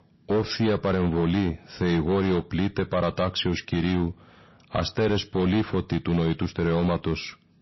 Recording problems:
distortion; slight; 9% of the sound clipped
garbled, watery; slightly; nothing above 5.5 kHz

